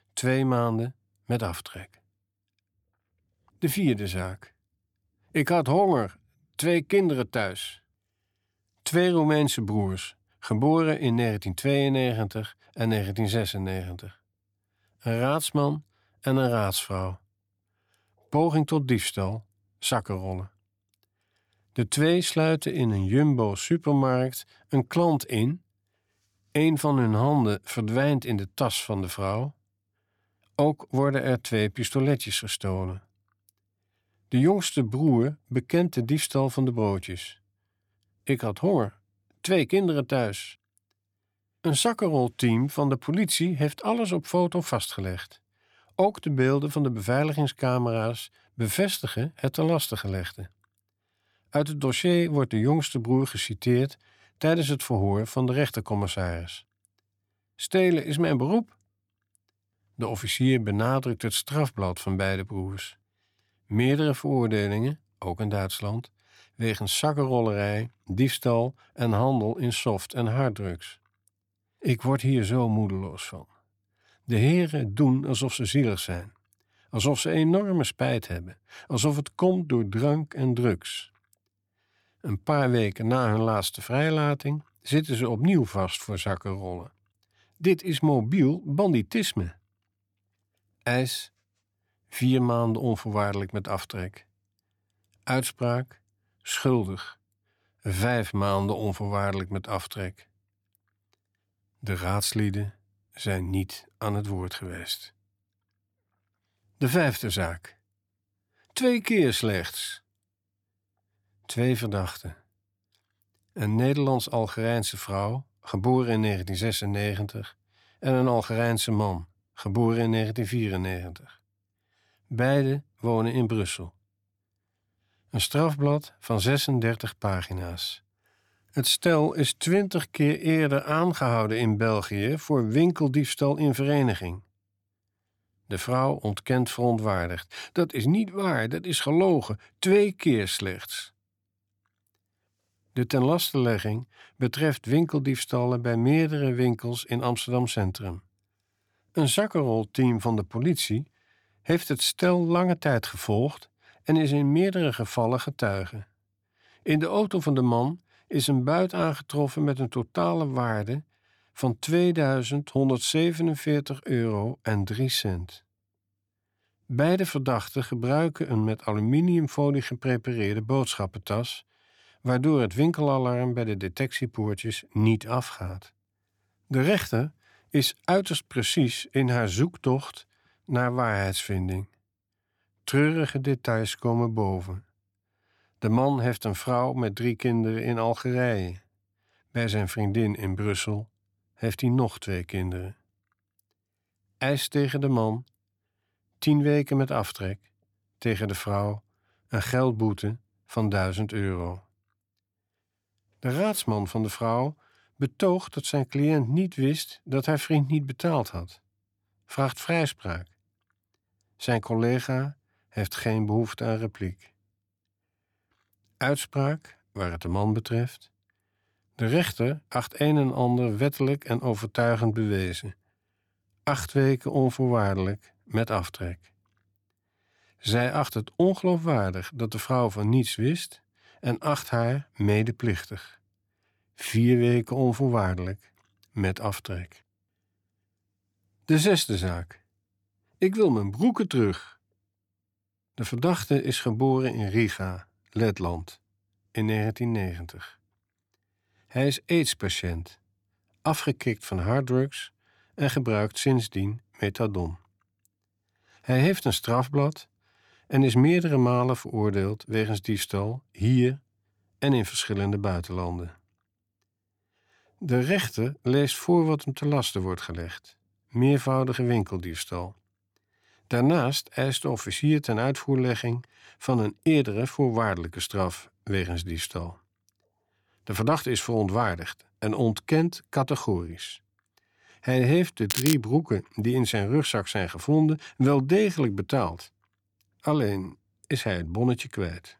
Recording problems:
crackling; loud; at 4:43; 3 dB below the speech

